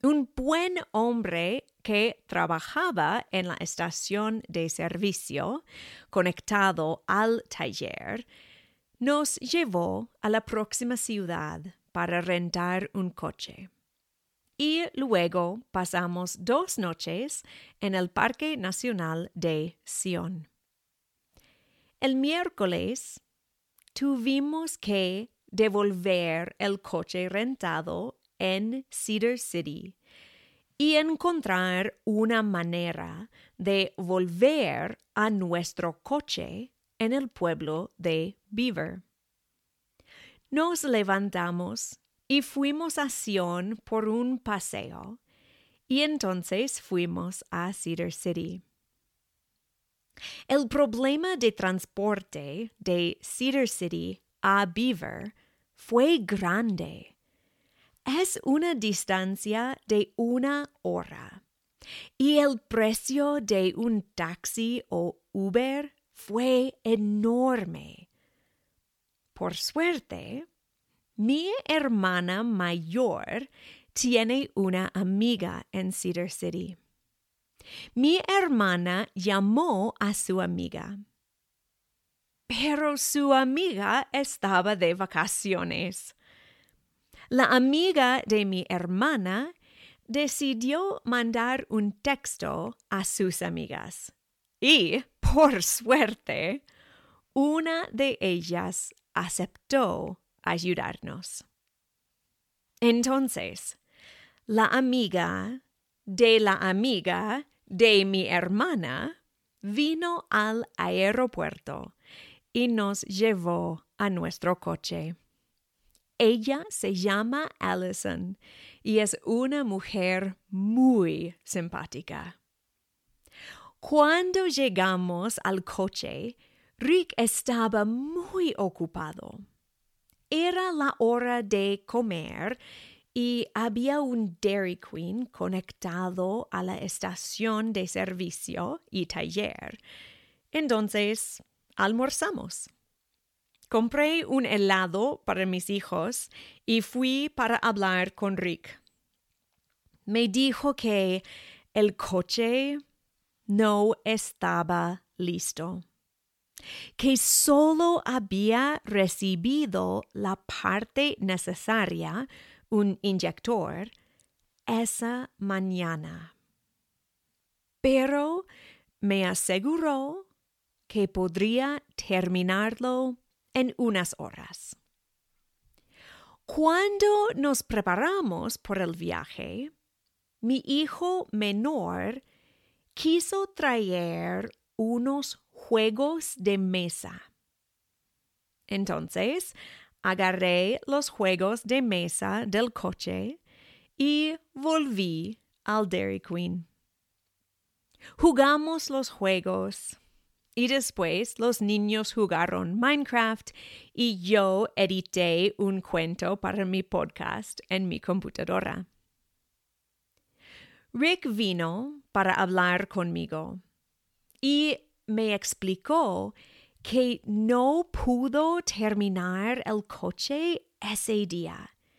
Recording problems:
none

